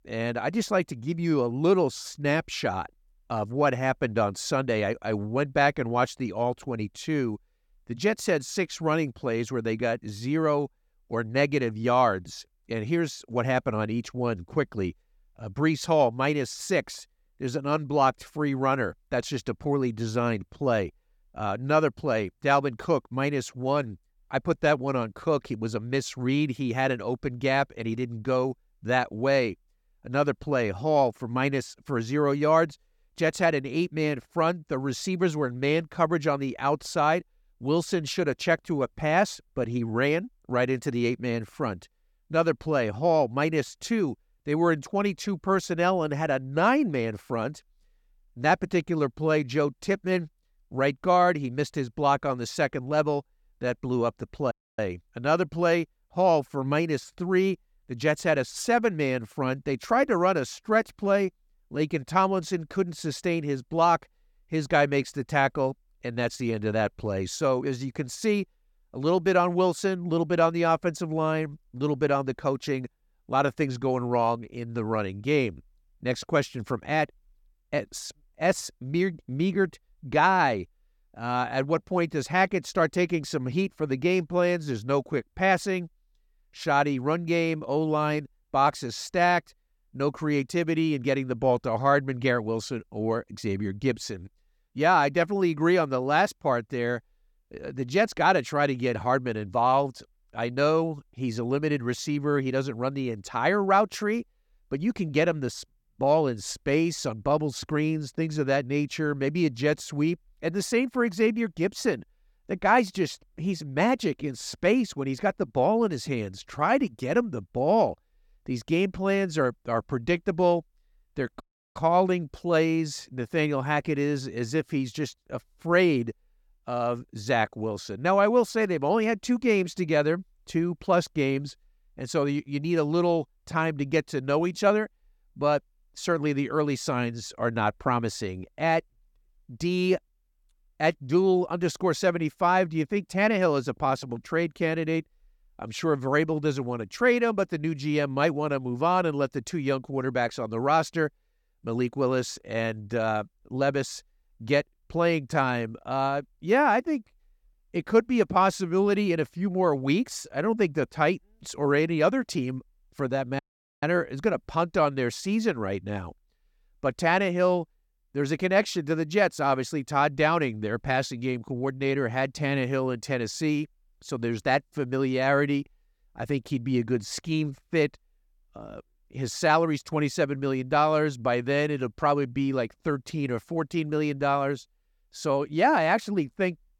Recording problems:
audio cutting out; at 55 s, at 2:01 and at 2:43

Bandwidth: 17.5 kHz